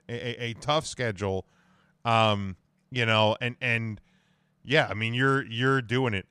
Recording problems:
none

